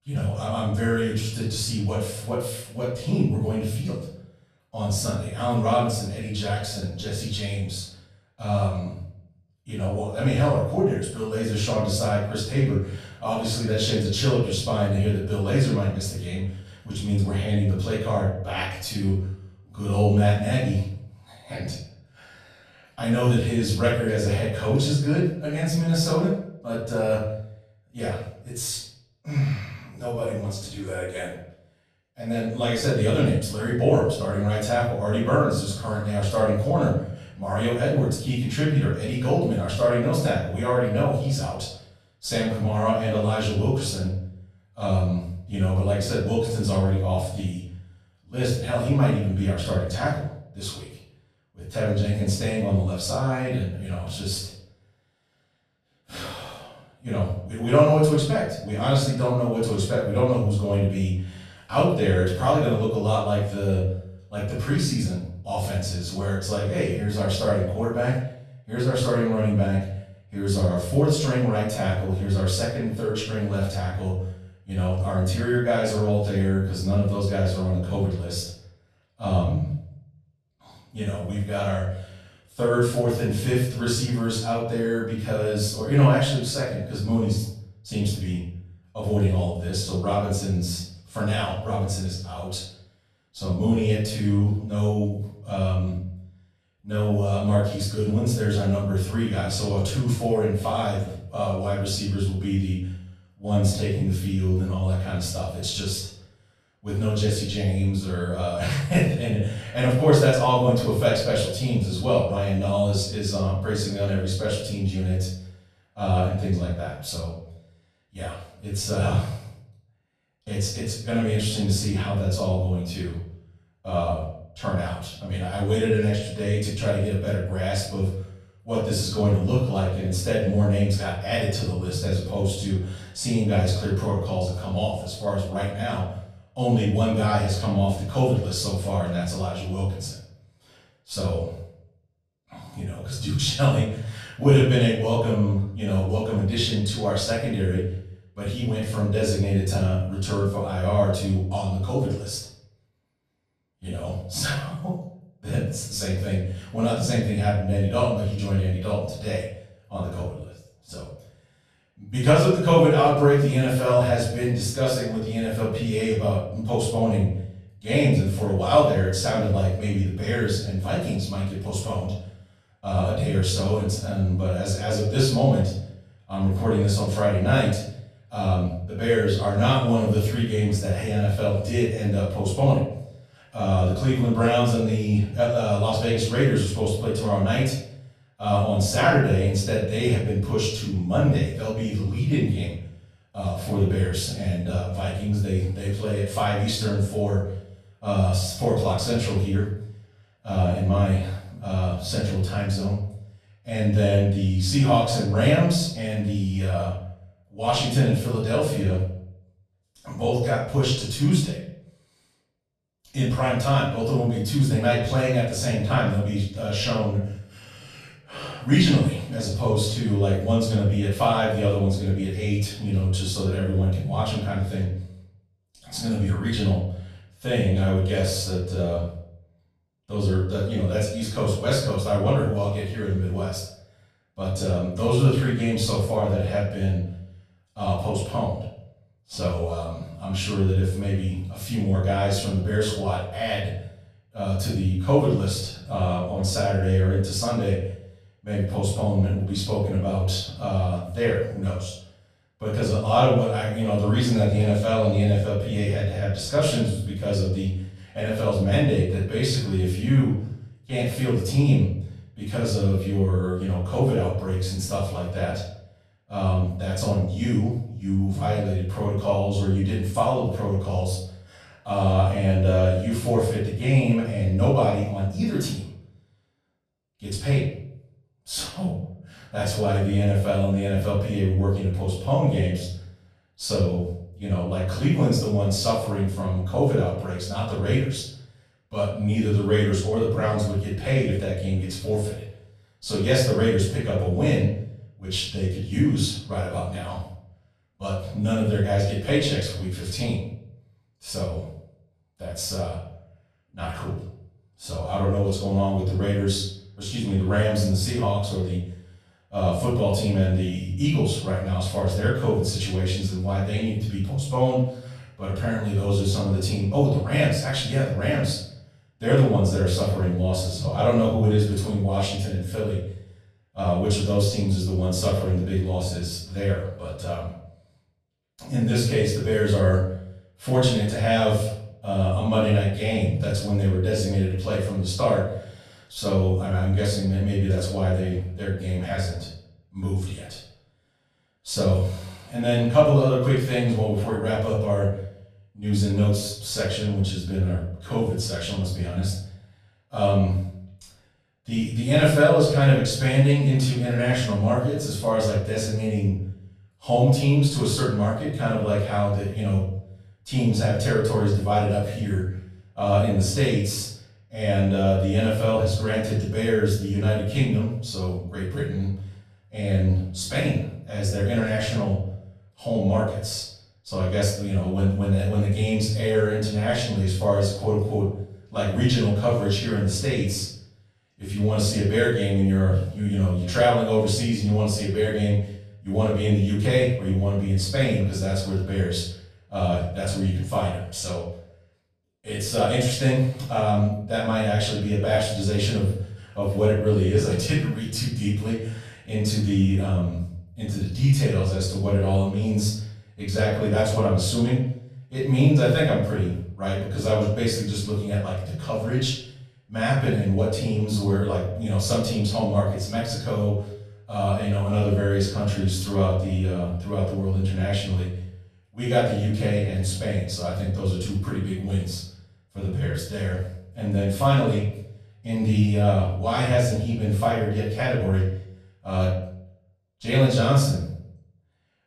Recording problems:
off-mic speech; far
room echo; noticeable; dies away in 0.6 s

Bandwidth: 14.5 kHz